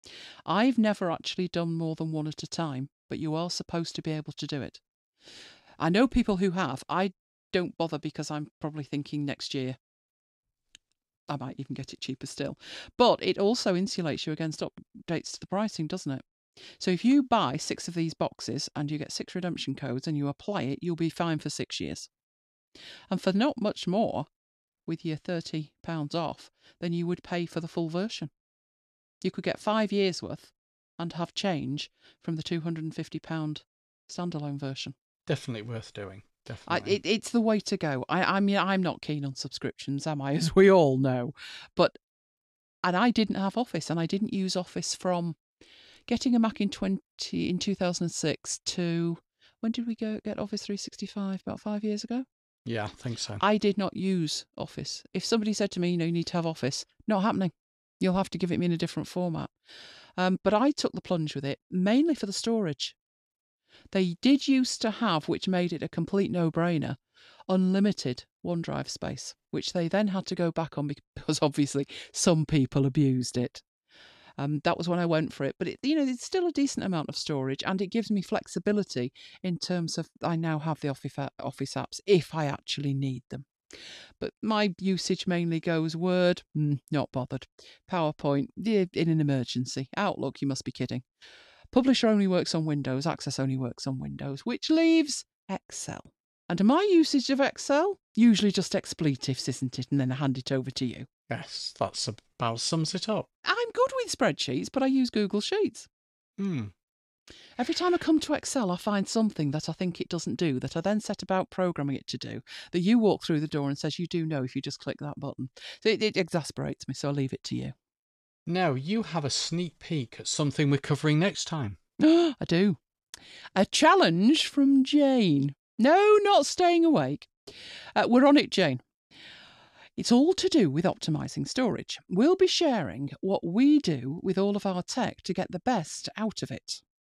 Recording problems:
none

